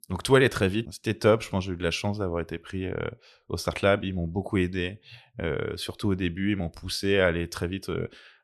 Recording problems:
none

